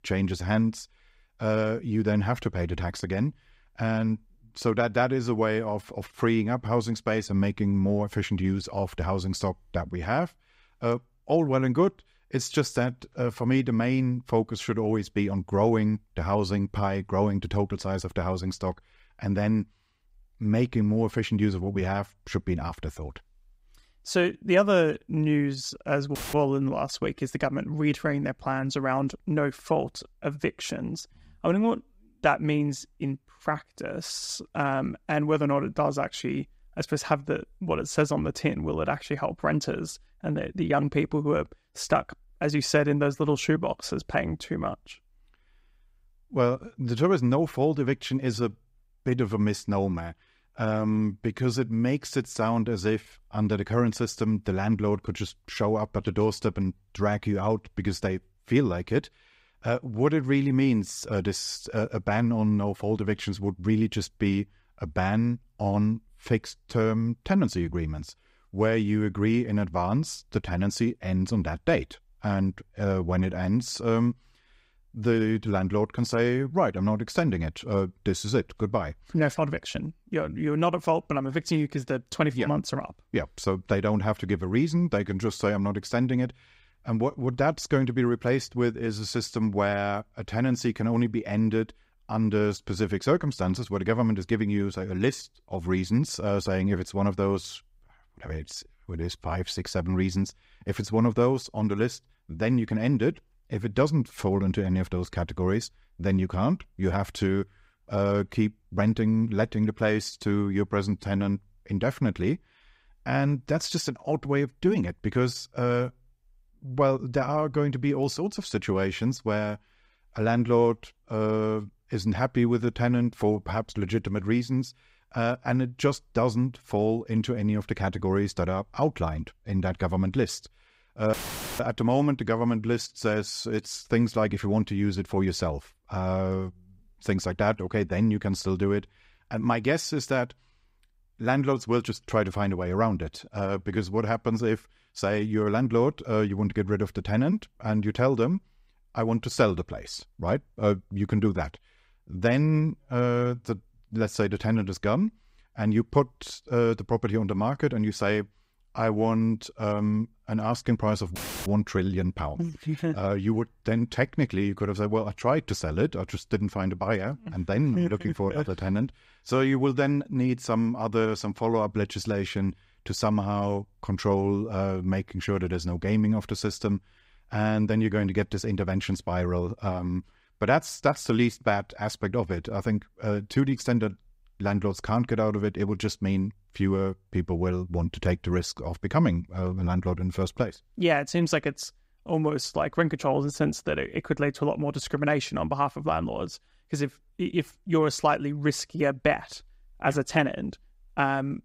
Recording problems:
audio cutting out; filled with static; at 26 s, at 2:11 and at 2:41

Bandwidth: 15.5 kHz